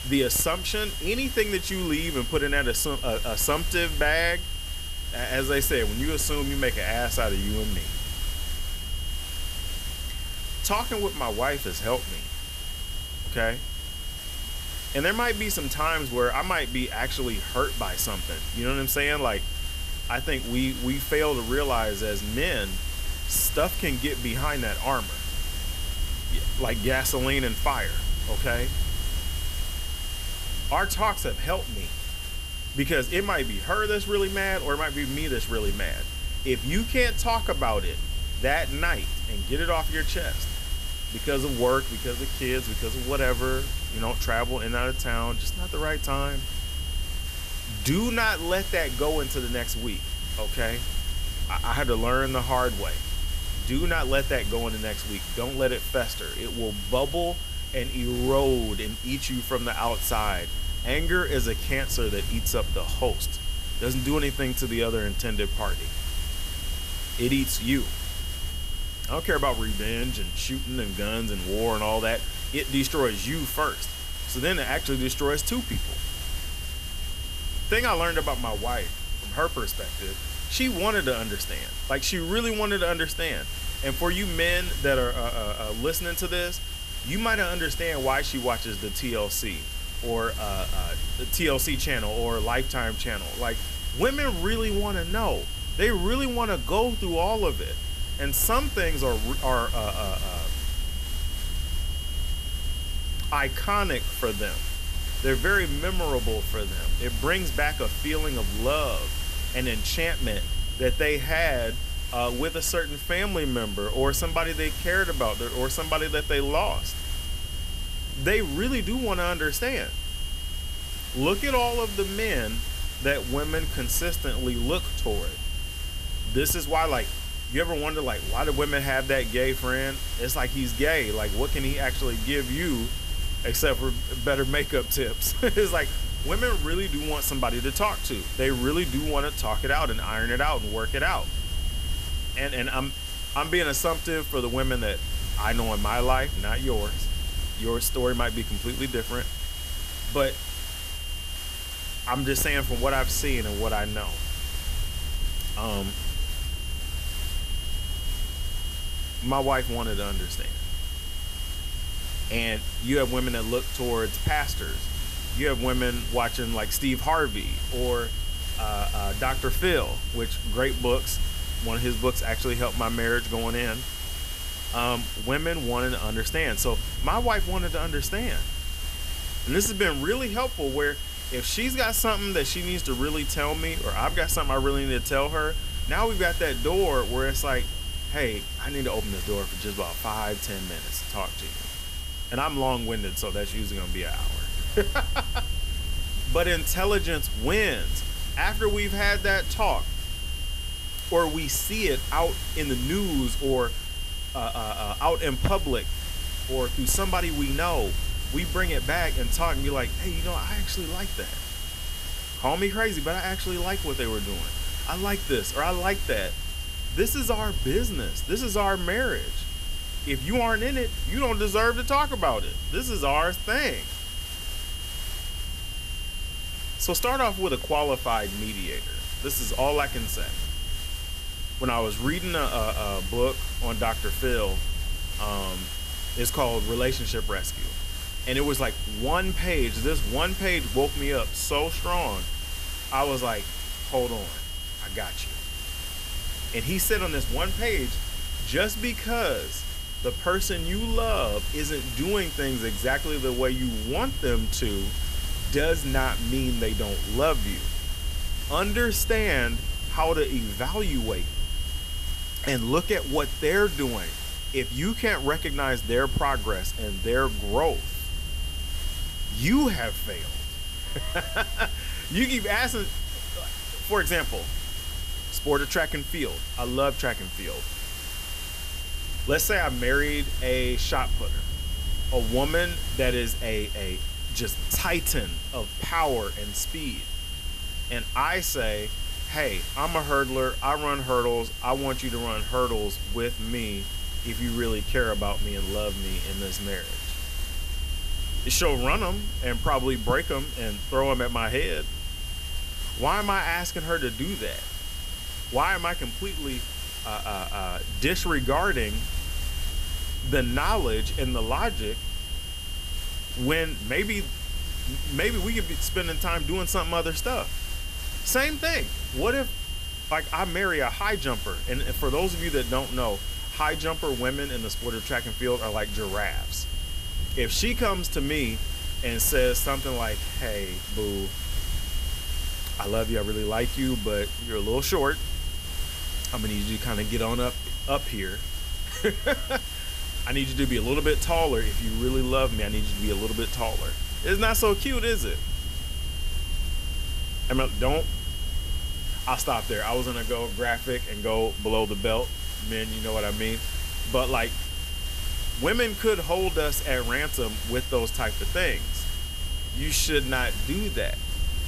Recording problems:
high-pitched whine; loud; throughout; 3 kHz, 8 dB below the speech
hiss; noticeable; throughout; 10 dB below the speech
low rumble; faint; throughout; 25 dB below the speech

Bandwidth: 14.5 kHz